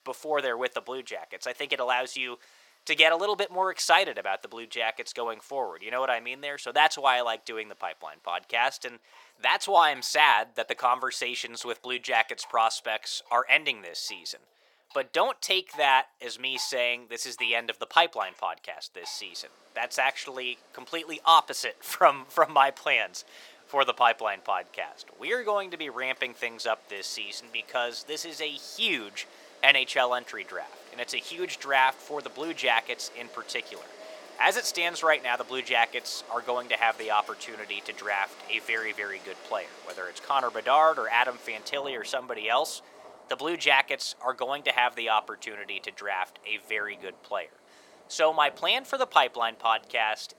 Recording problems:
thin; very; fading below 650 Hz
rain or running water; faint; throughout; 25 dB below the speech

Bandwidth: 17 kHz